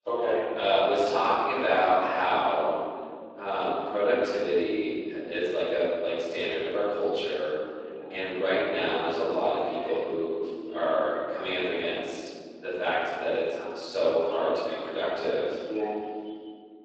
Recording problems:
room echo; strong; dies away in 2.2 s
off-mic speech; far
thin; very; fading below 350 Hz
garbled, watery; slightly

